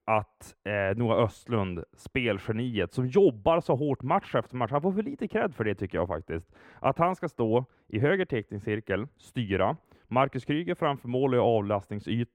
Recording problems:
muffled; slightly; fading above 3.5 kHz

